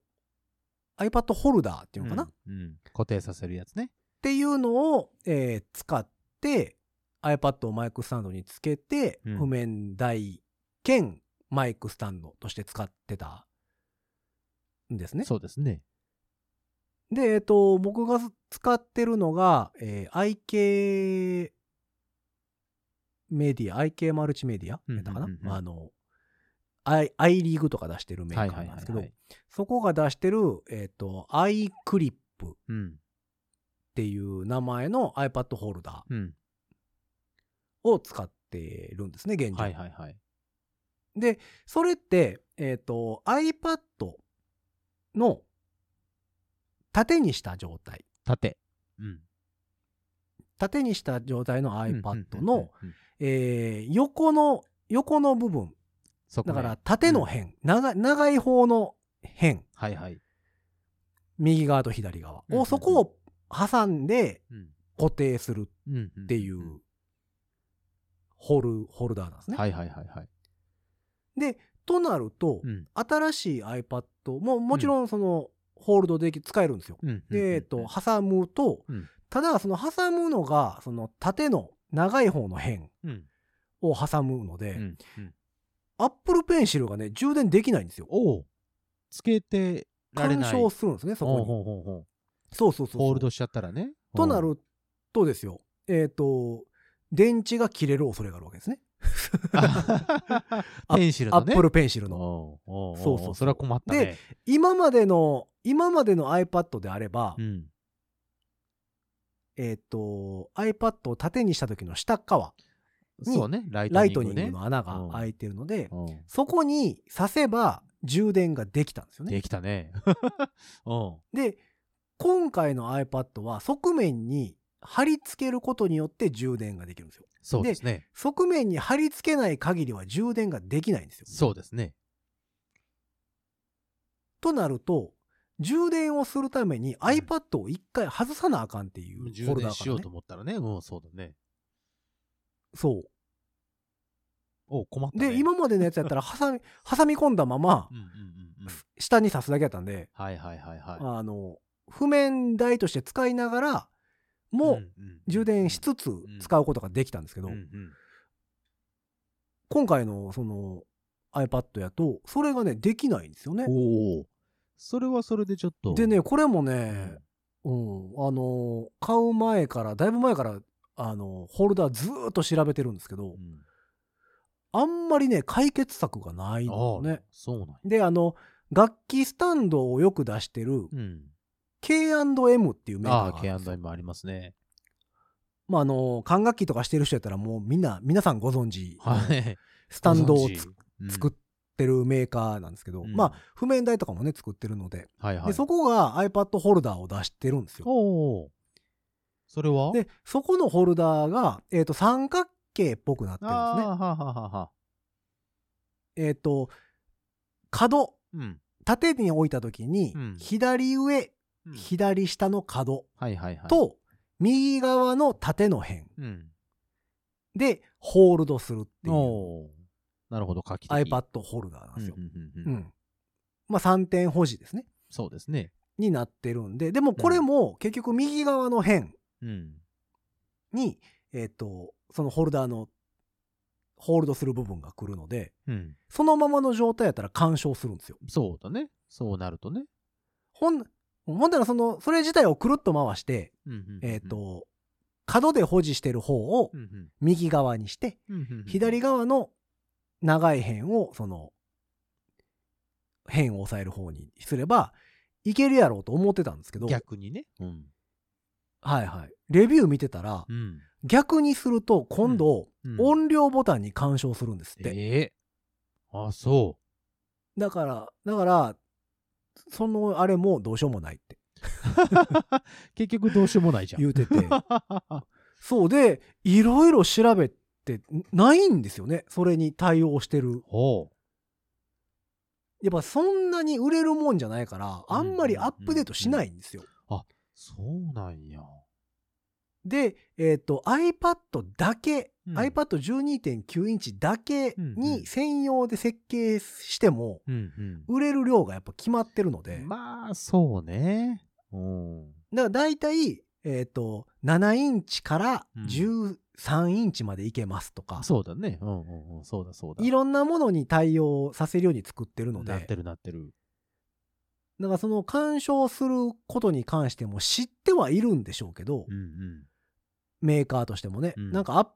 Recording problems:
none

